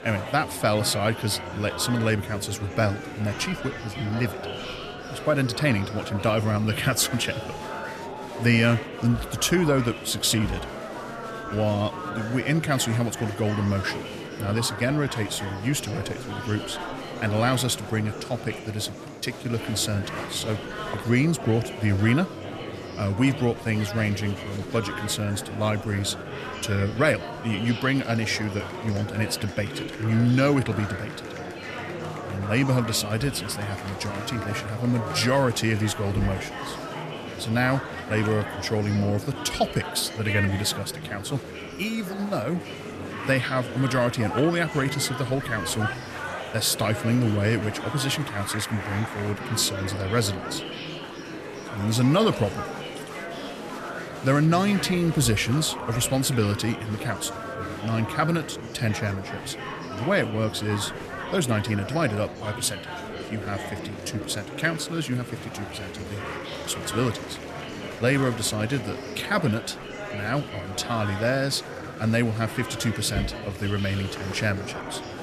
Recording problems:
murmuring crowd; loud; throughout; 8 dB below the speech

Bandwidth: 14 kHz